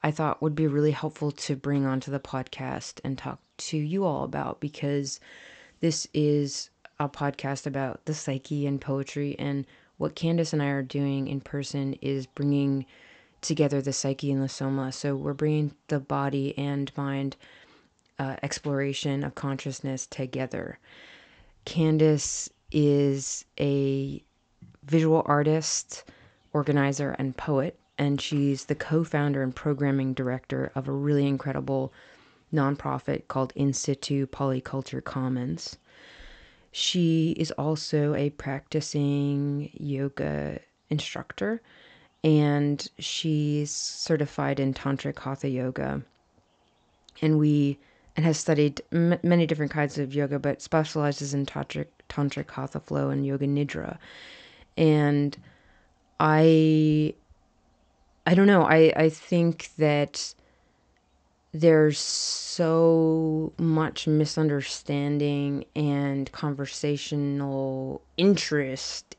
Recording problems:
high frequencies cut off; noticeable; nothing above 8 kHz

